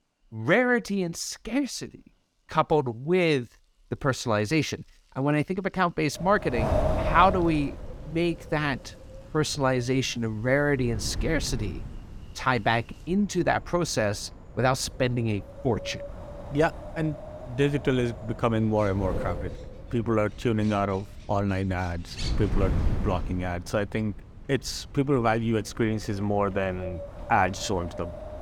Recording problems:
wind noise on the microphone; occasional gusts; from 6 s on; 10 dB below the speech
animal sounds; faint; throughout; 25 dB below the speech

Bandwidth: 18 kHz